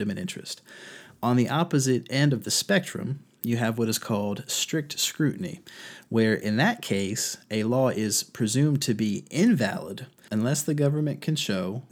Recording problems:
abrupt cut into speech; at the start

